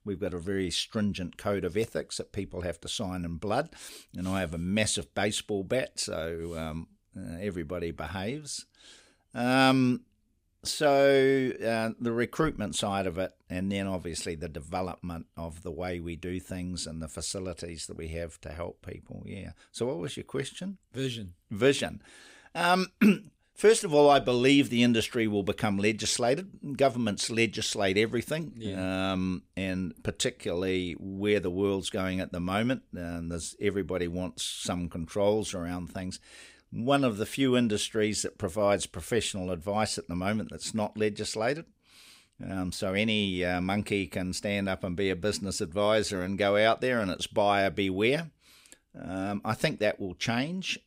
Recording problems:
none

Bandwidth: 15.5 kHz